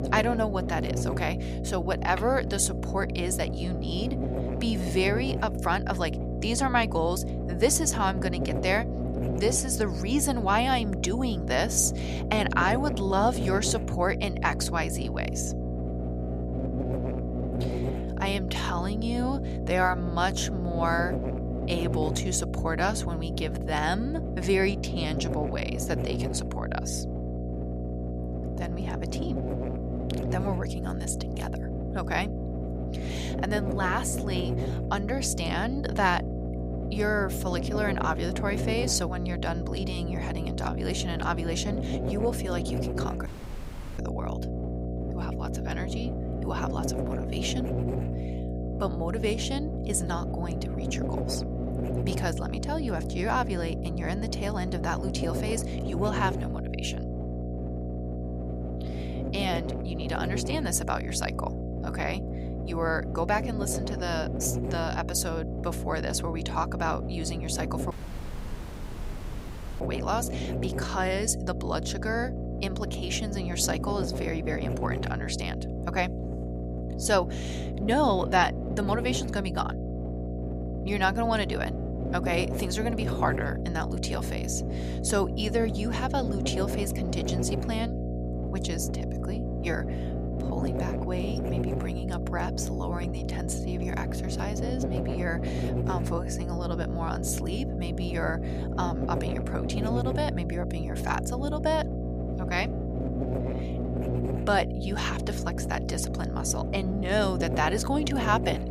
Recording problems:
electrical hum; loud; throughout; 60 Hz, 7 dB below the speech
audio cutting out; at 43 s for 0.5 s and at 1:08 for 2 s

